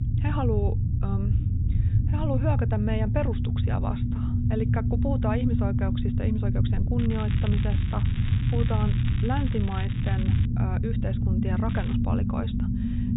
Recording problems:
high frequencies cut off; severe; nothing above 4 kHz
low rumble; loud; throughout; 3 dB below the speech
crackling; noticeable; from 7 to 10 s and at 12 s; 10 dB below the speech

